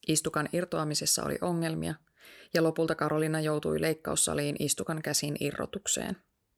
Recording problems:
none

